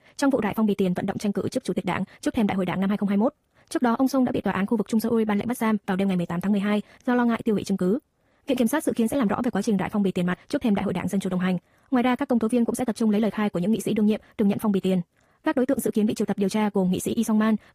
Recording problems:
wrong speed, natural pitch; too fast; 1.6 times normal speed
garbled, watery; slightly; nothing above 15 kHz

